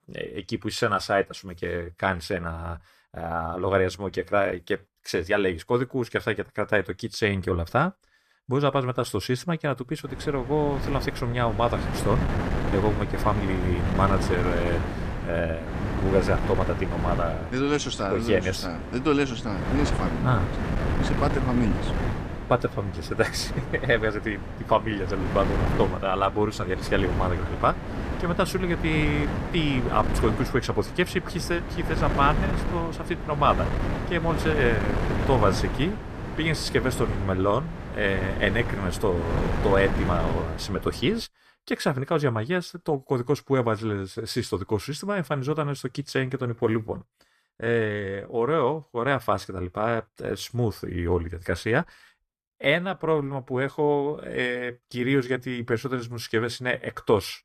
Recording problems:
wind noise on the microphone; heavy; from 10 to 41 s; 7 dB below the speech

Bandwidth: 14.5 kHz